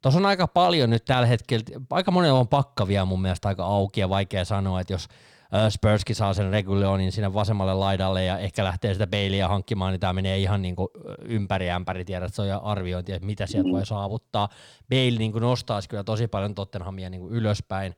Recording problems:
none

